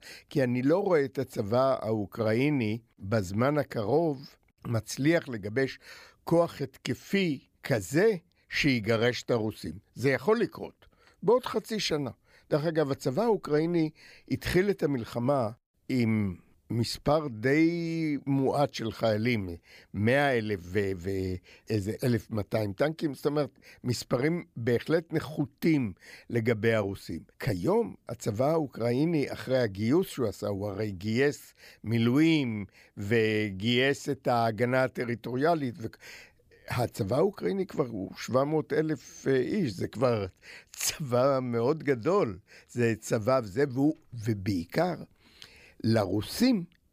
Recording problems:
none

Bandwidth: 15 kHz